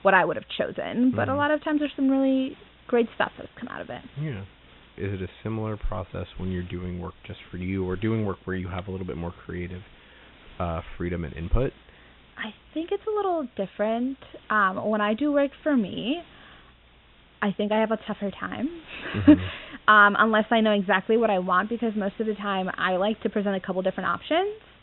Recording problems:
high frequencies cut off; severe; nothing above 3.5 kHz
hiss; faint; throughout; 25 dB below the speech

